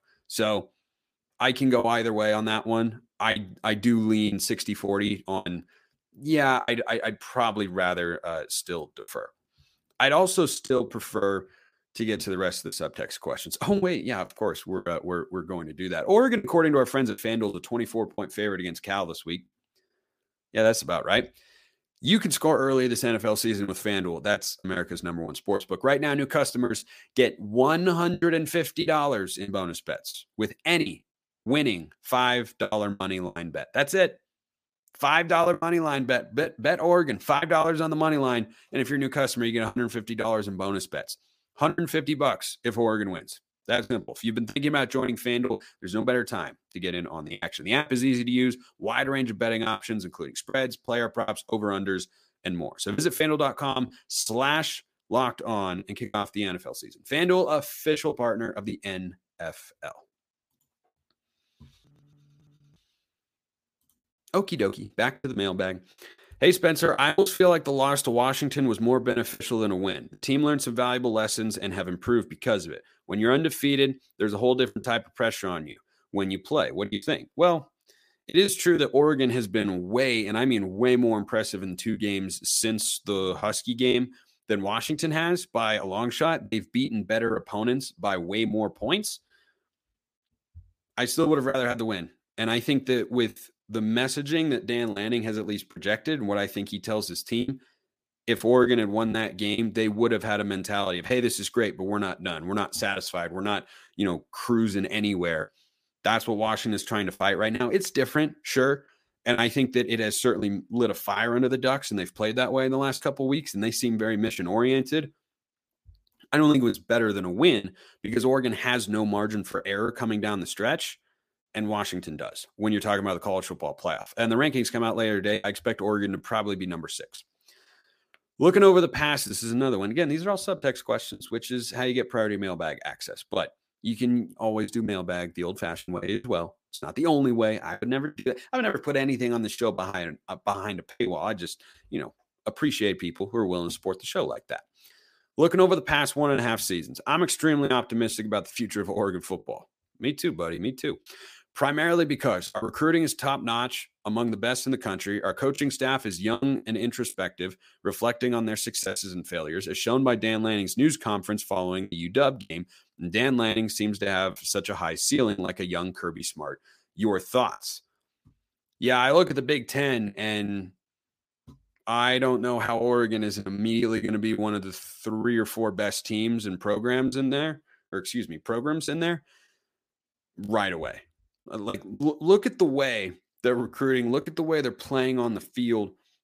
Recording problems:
choppy; very; 5% of the speech affected

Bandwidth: 15 kHz